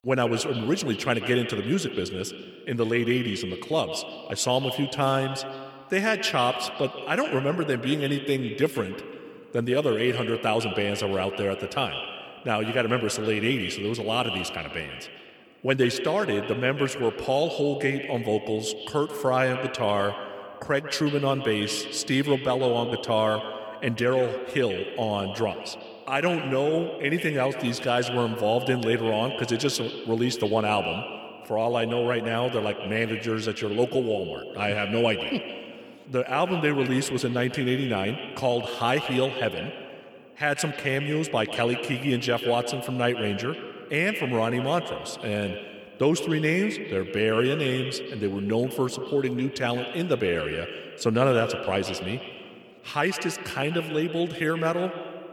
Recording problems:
echo of what is said; strong; throughout; 140 ms later, 8 dB below the speech

